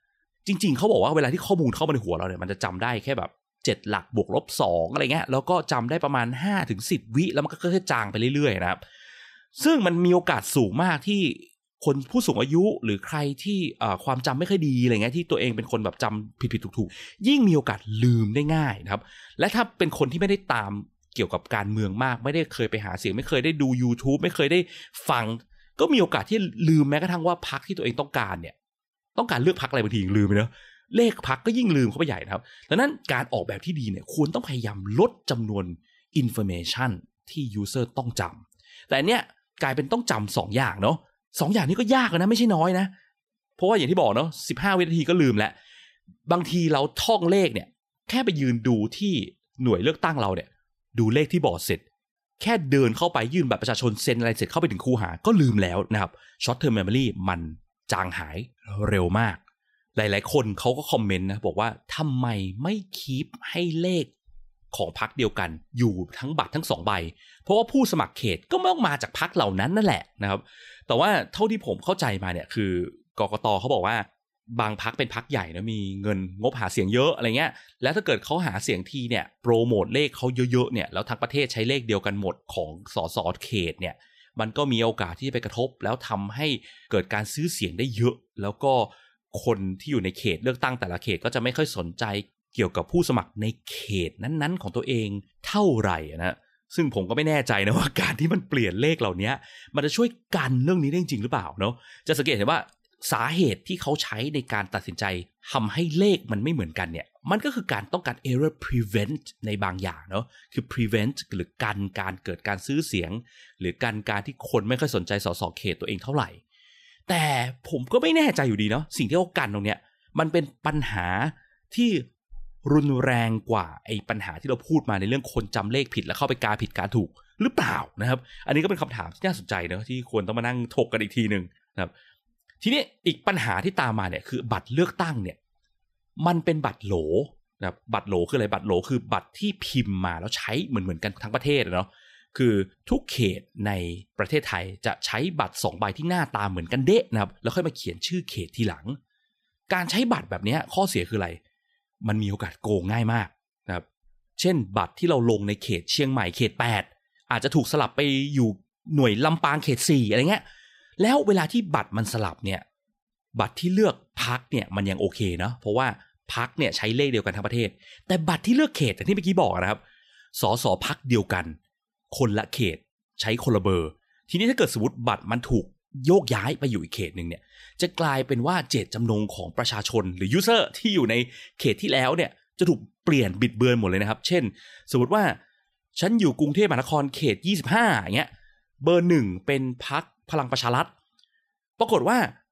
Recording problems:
none

